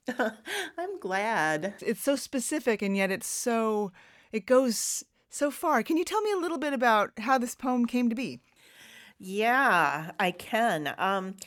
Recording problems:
none

